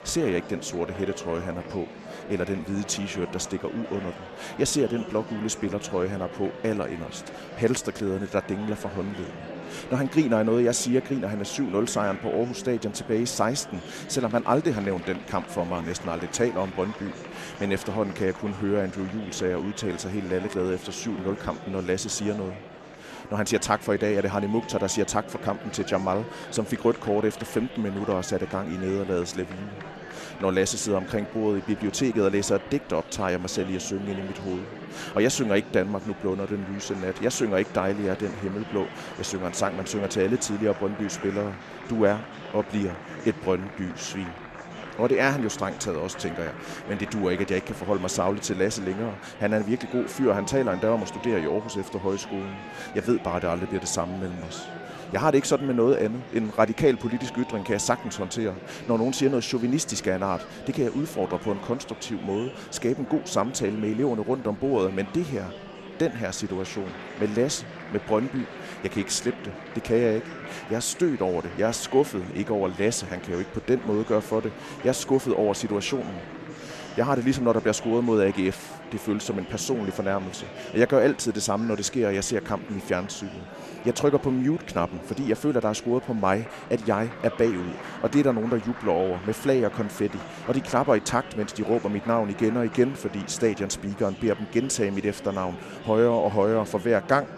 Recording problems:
murmuring crowd; noticeable; throughout; 15 dB below the speech

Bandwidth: 13.5 kHz